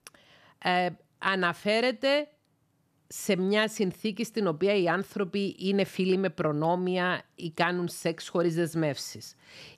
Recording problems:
none

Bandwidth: 14.5 kHz